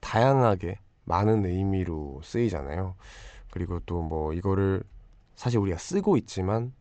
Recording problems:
high frequencies cut off; noticeable; nothing above 8 kHz

